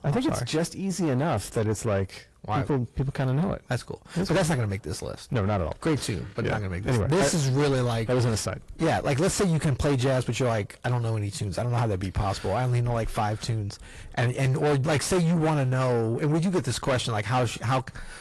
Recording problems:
distortion; heavy; 5 dB below the speech
garbled, watery; slightly; nothing above 11.5 kHz

